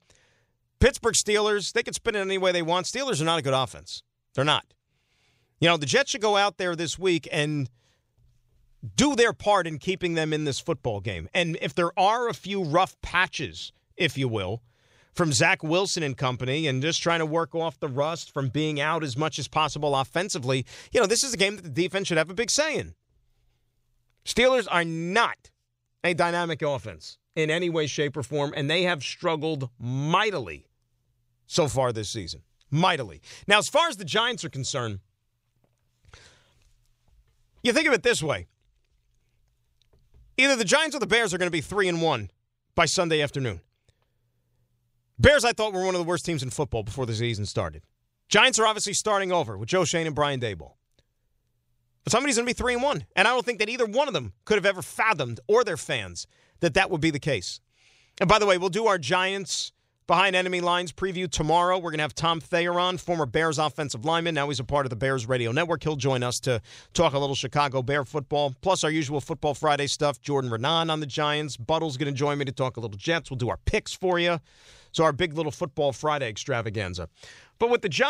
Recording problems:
abrupt cut into speech; at the end

